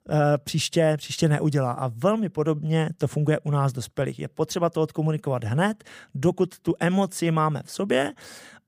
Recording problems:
none

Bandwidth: 15 kHz